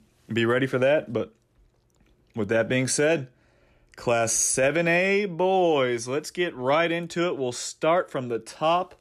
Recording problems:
none

